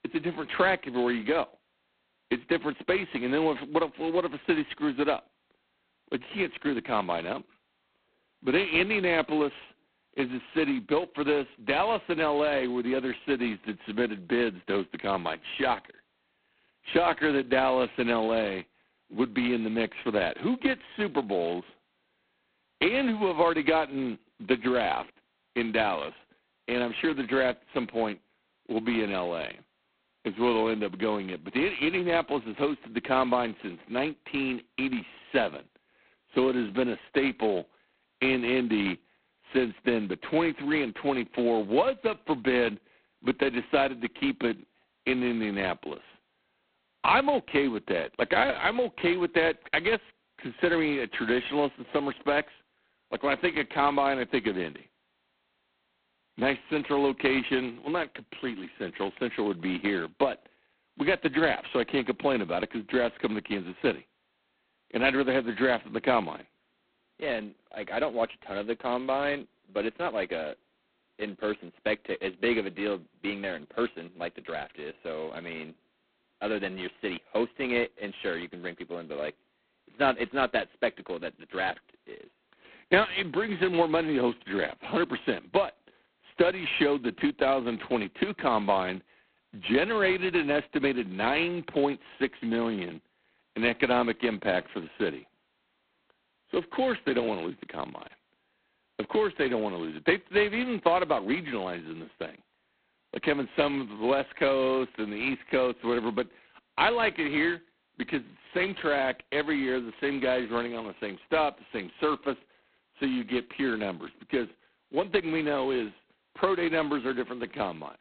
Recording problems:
phone-call audio; poor line; nothing above 4 kHz

